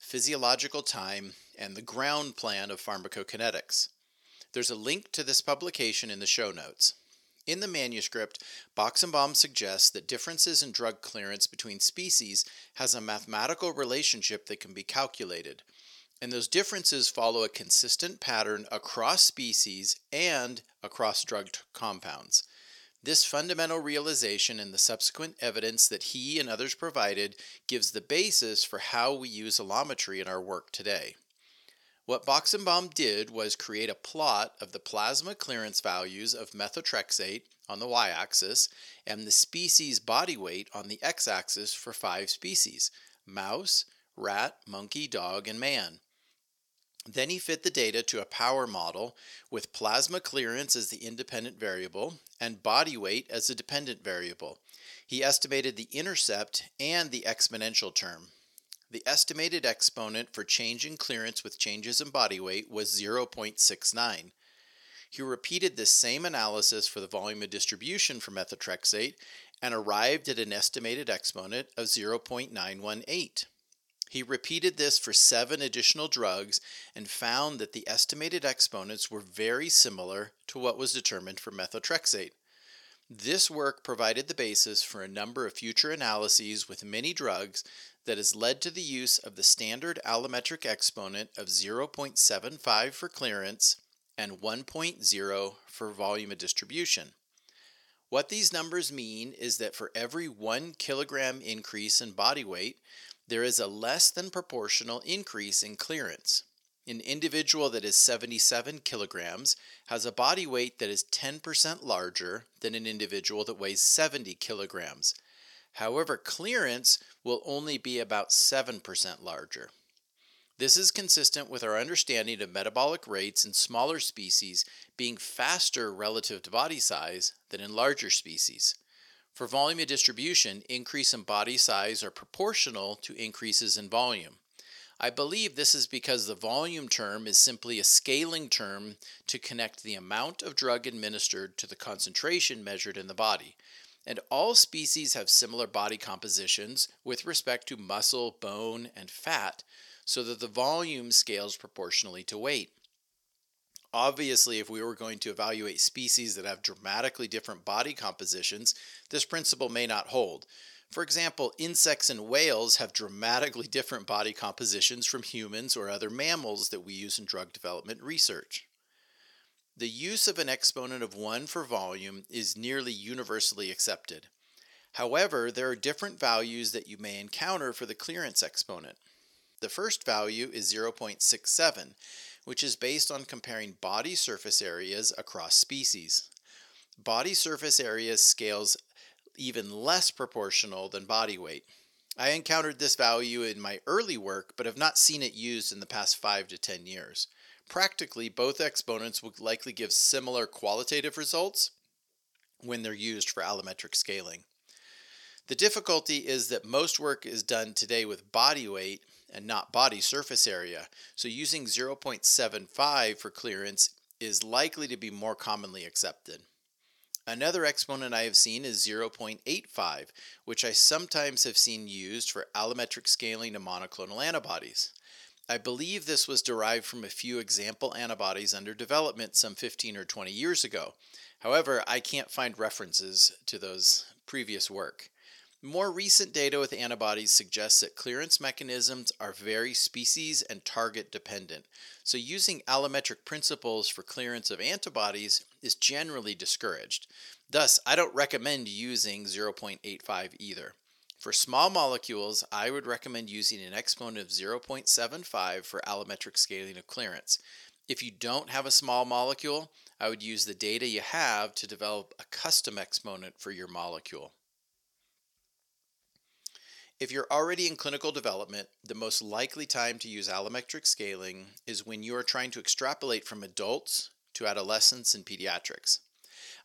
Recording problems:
thin; somewhat; fading below 450 Hz

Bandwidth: 17 kHz